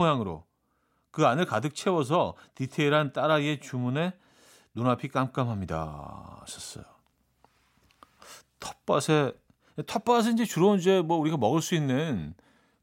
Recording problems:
abrupt cut into speech; at the start

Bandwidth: 16 kHz